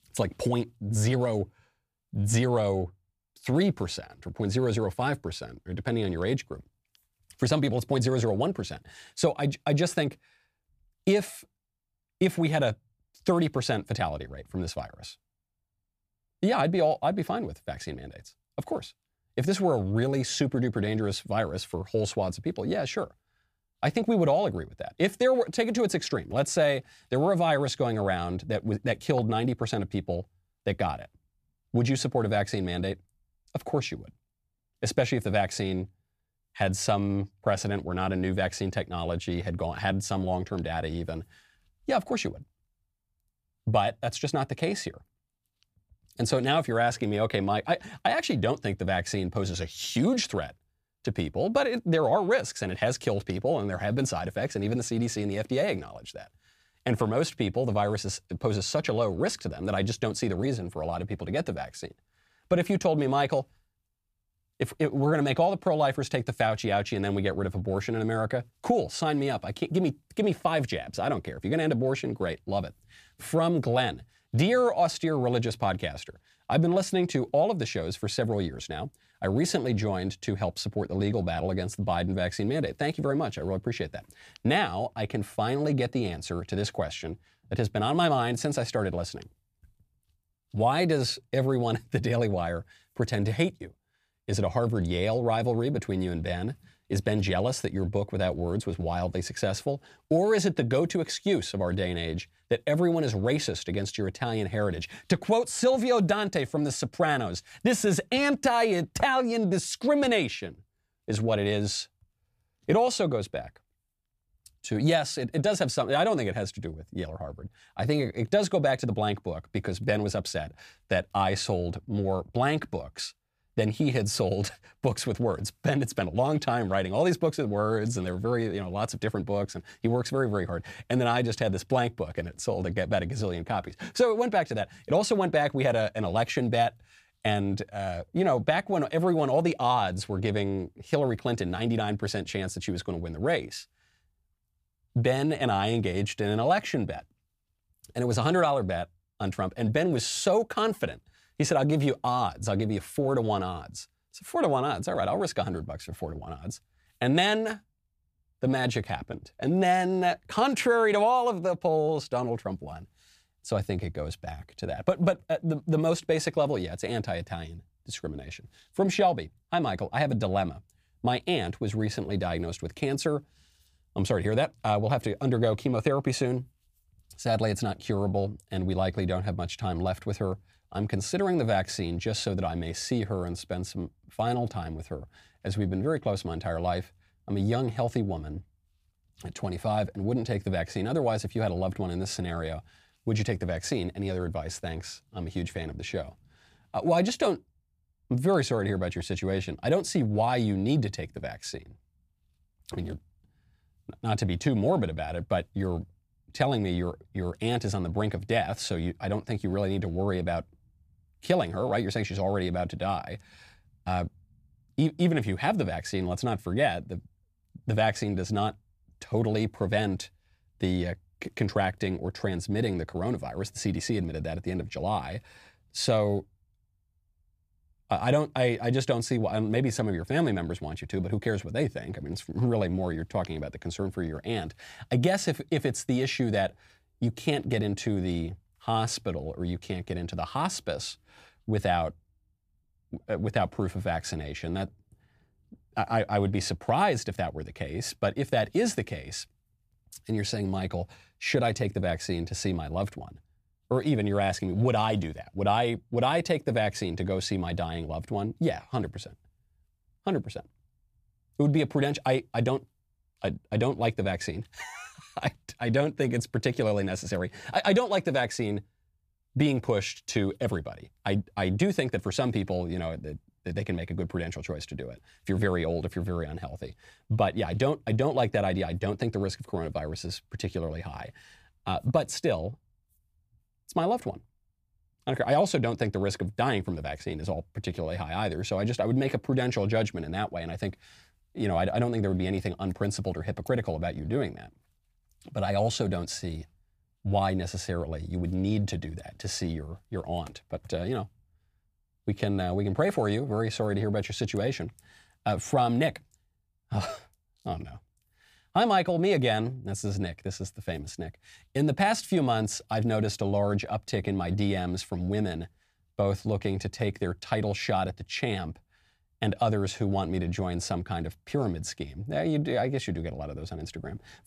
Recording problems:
none

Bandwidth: 15 kHz